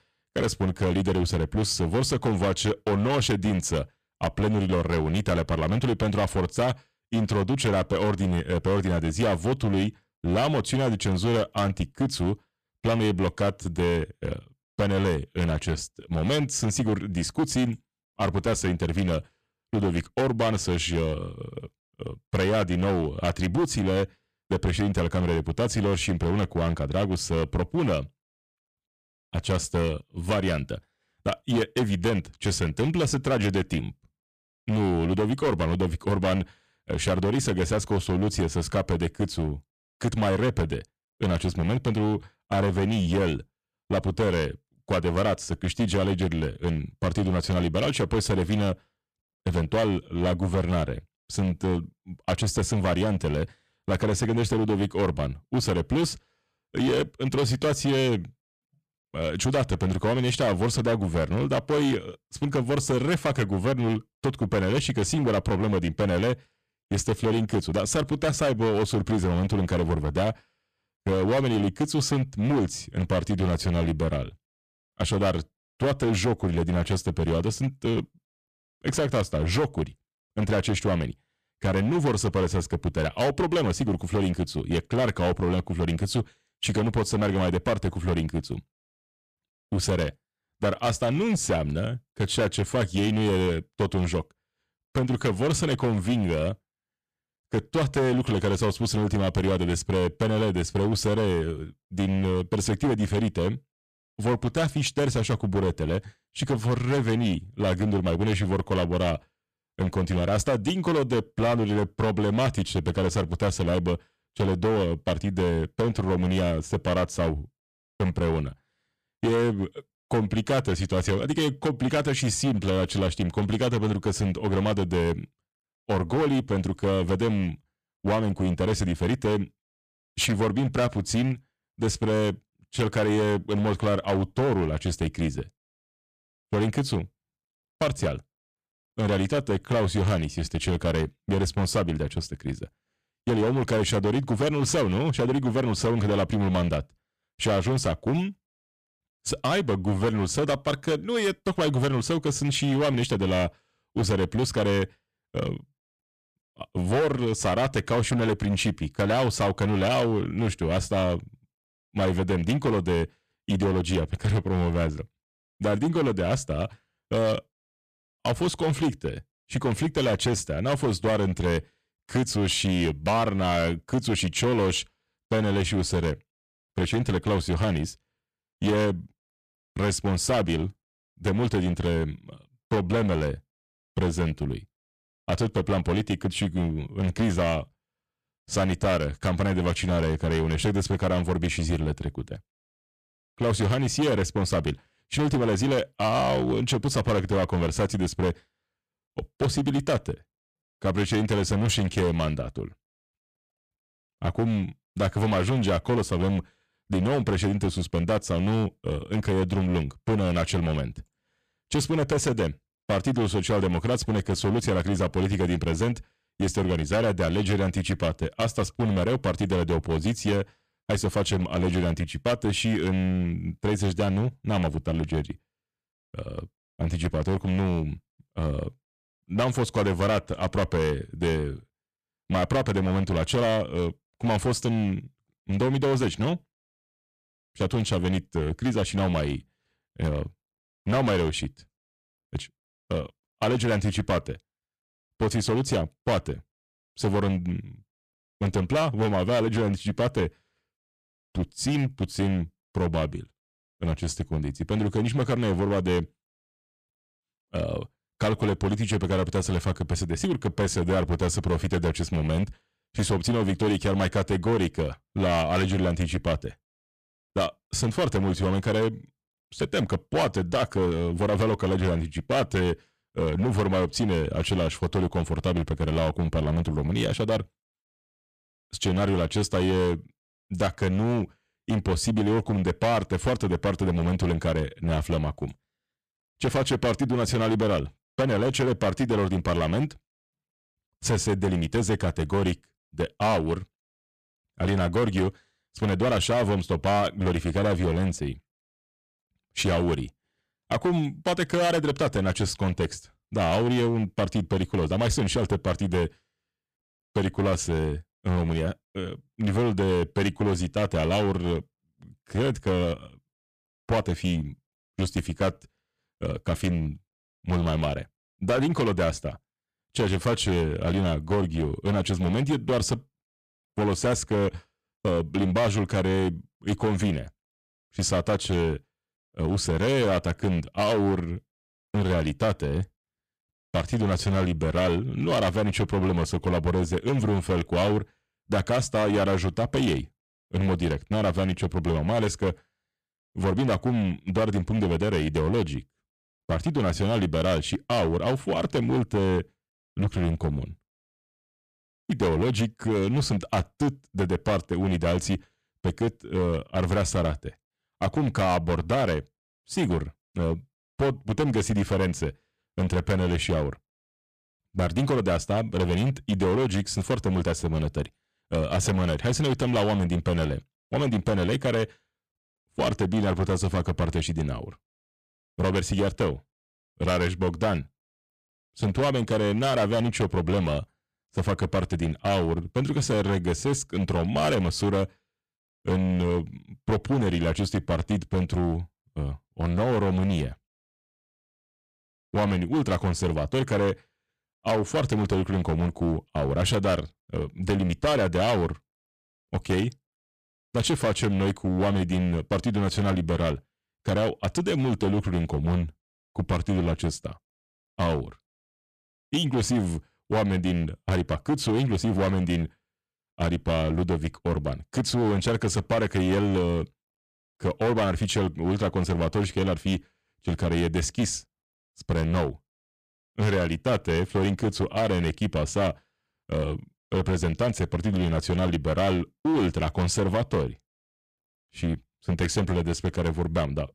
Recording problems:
distortion; heavy; 13% of the sound clipped

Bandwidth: 14.5 kHz